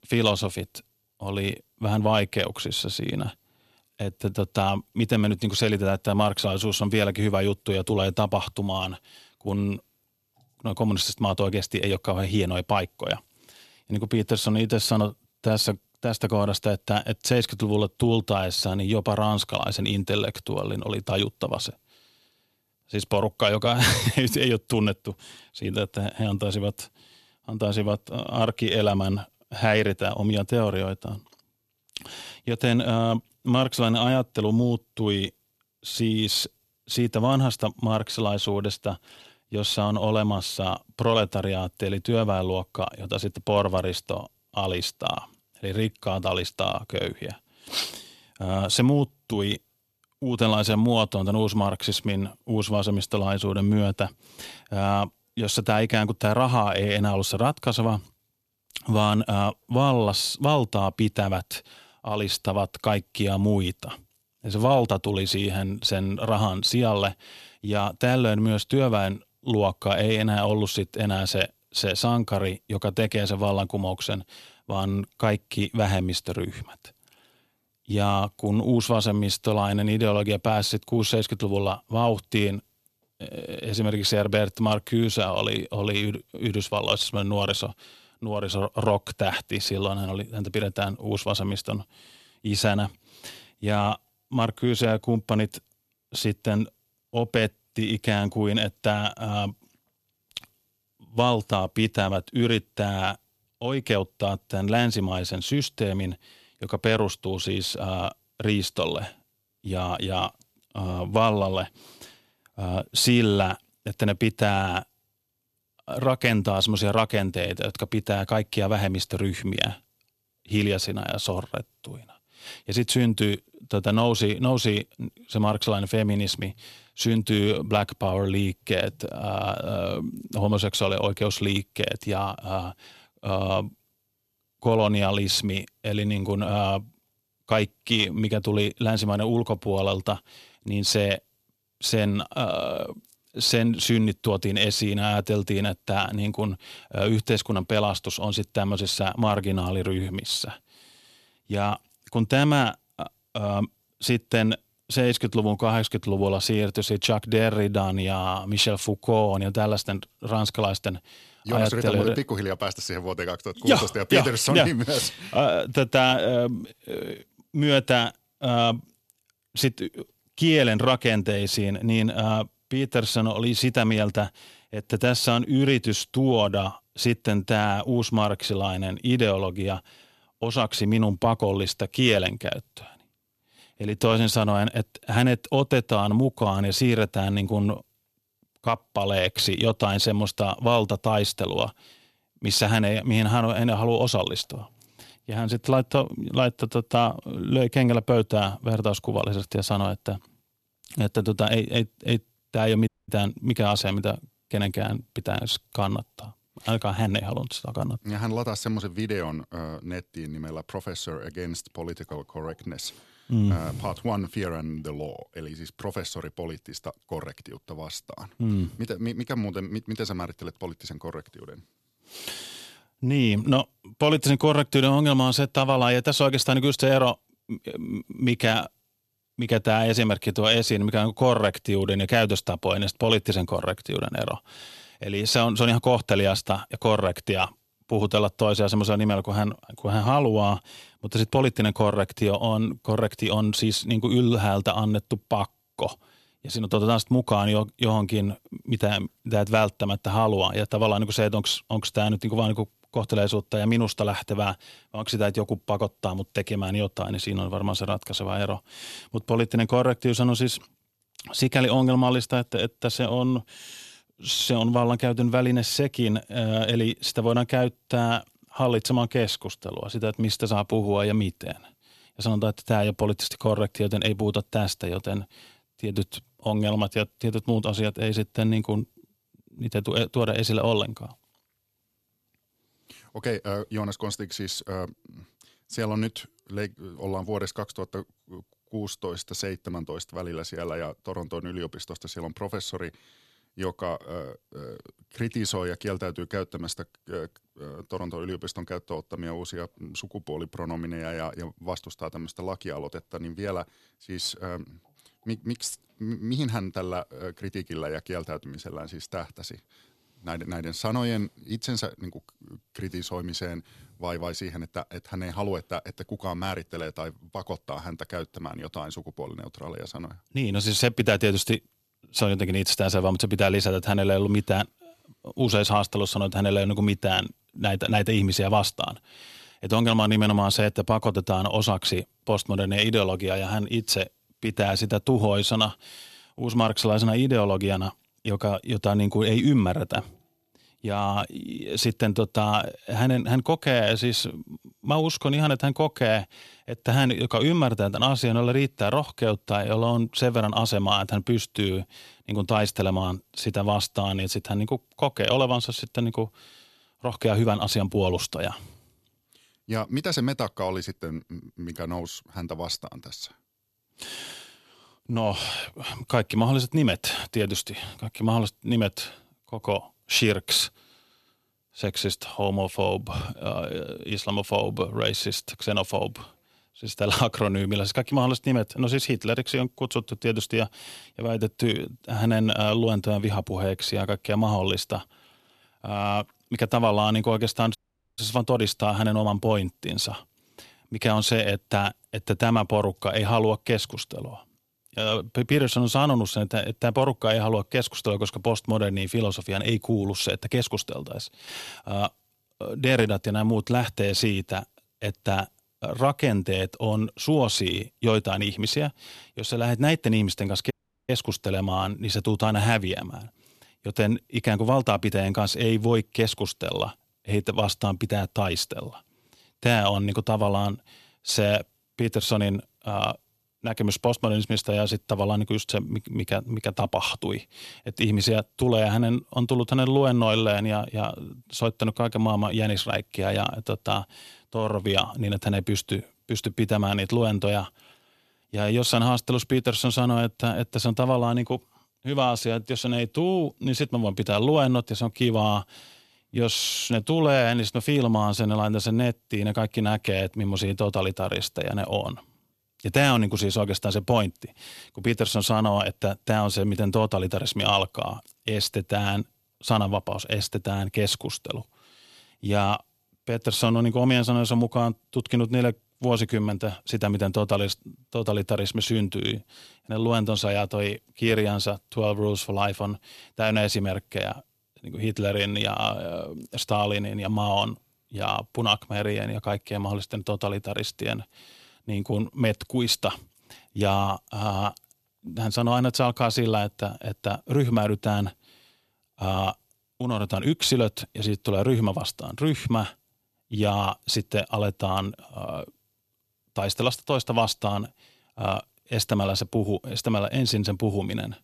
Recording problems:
audio cutting out; at 3:23, at 6:28 and at 6:51

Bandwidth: 13.5 kHz